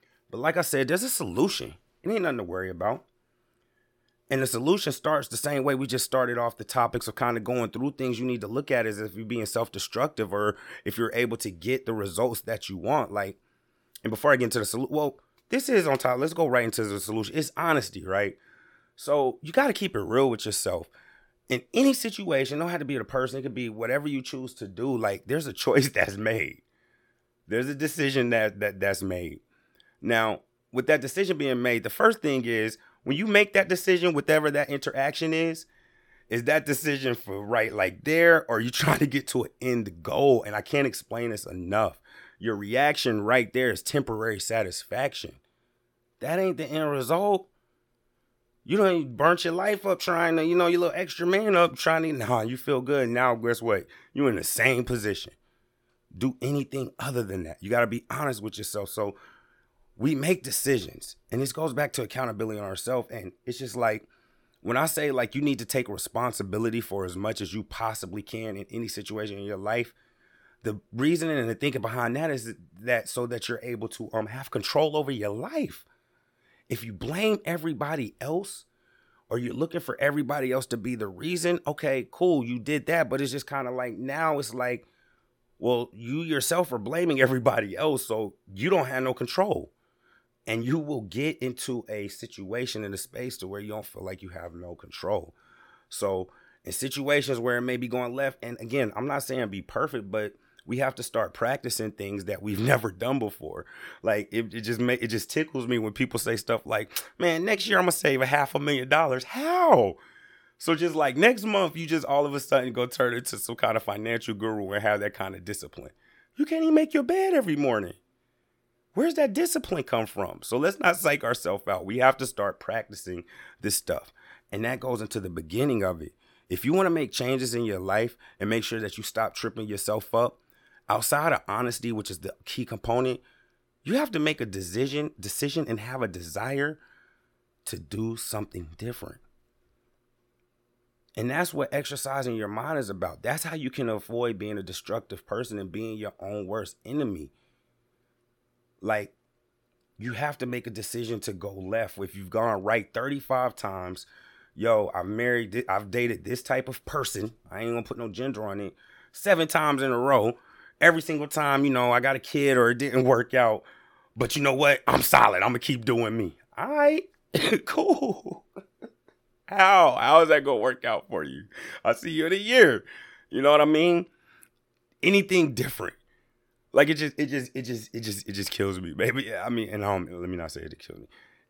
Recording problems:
none

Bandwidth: 17.5 kHz